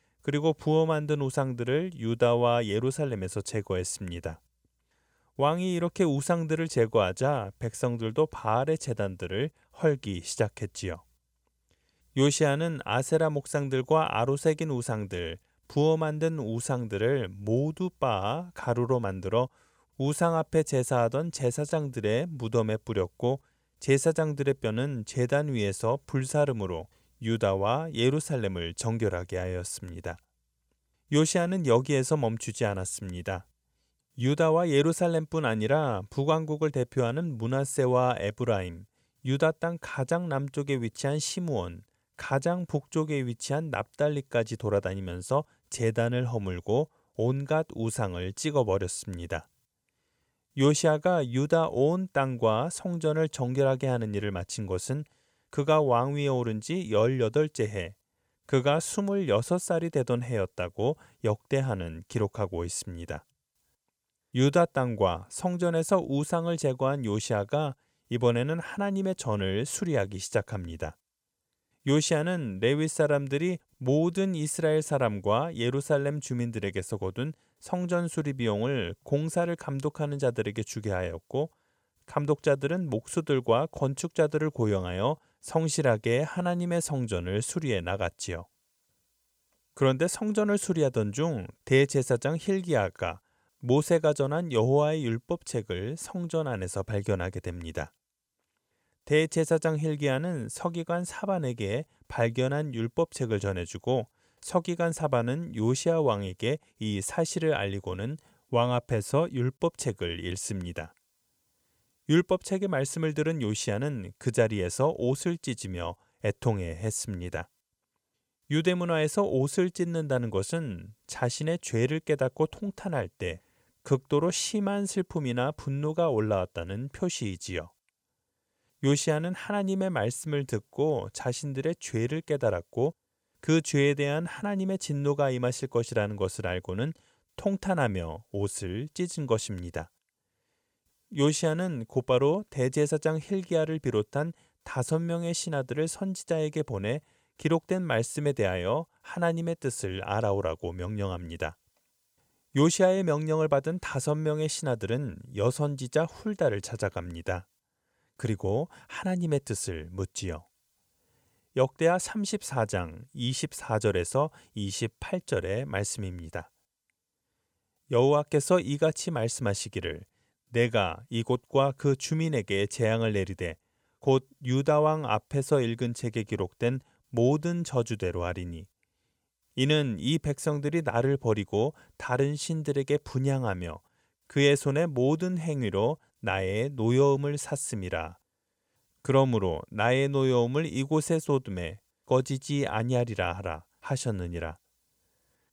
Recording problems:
none

